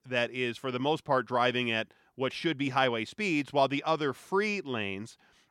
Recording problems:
none

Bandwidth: 17.5 kHz